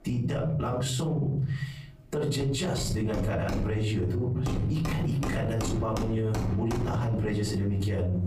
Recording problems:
off-mic speech; far
room echo; slight; dies away in 0.6 s
squashed, flat; somewhat, background pumping
machinery noise; loud; throughout; 4 dB below the speech

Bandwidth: 15.5 kHz